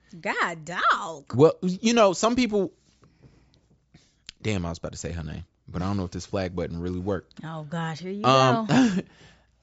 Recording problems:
high frequencies cut off; noticeable; nothing above 8 kHz

